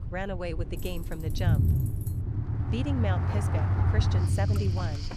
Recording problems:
rain or running water; loud; from 3 s on; 6 dB below the speech
low rumble; loud; throughout; 4 dB below the speech
jangling keys; faint; from 1 to 2 s; peak 10 dB below the speech
dog barking; noticeable; at 3.5 s; peak 10 dB below the speech

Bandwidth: 14 kHz